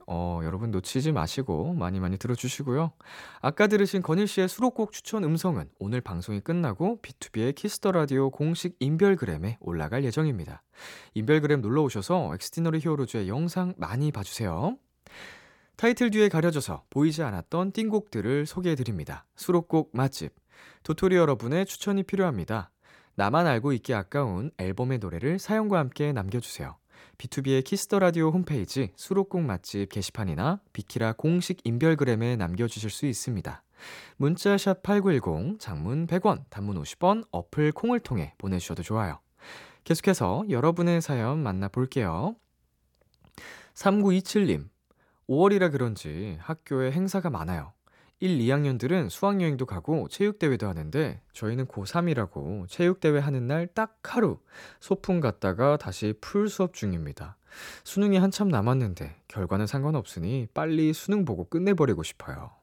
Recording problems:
none

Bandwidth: 17.5 kHz